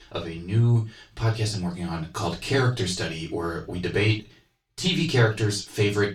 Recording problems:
off-mic speech; far
room echo; slight; dies away in 0.2 s

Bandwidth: 18.5 kHz